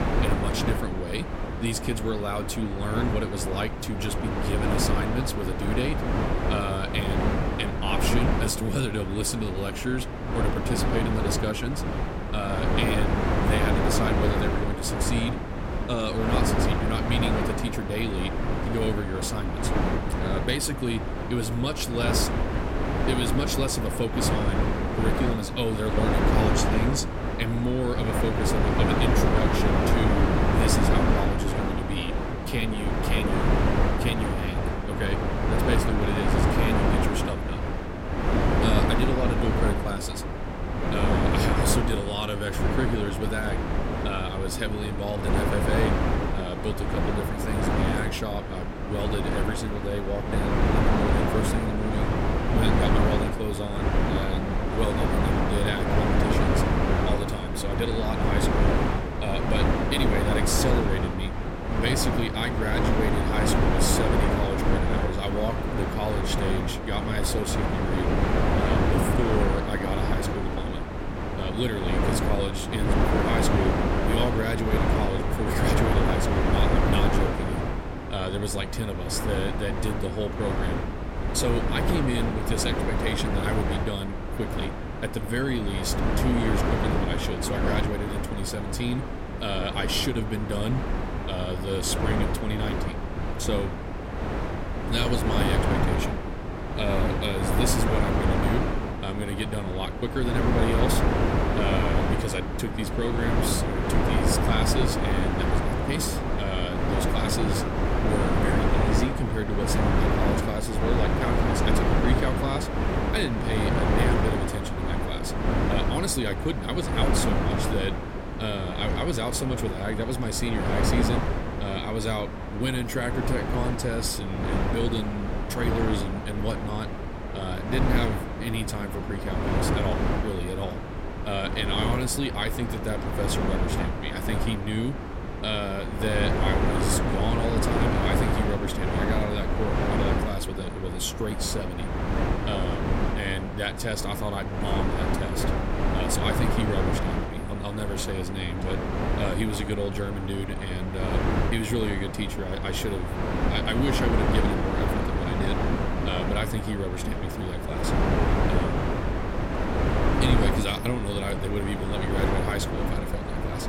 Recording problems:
wind noise on the microphone; heavy; 2 dB above the speech

